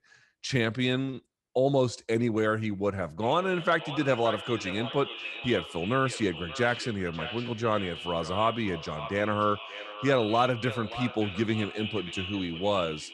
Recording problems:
echo of what is said; strong; from 3 s on; 580 ms later, 9 dB below the speech

